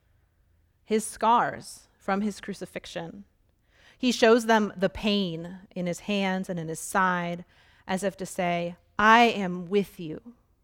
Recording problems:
none

